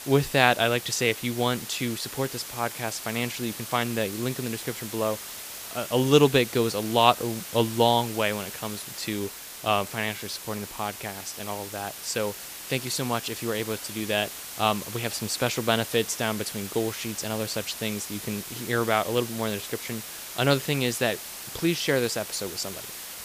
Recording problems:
hiss; loud; throughout; 9 dB below the speech

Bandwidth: 15 kHz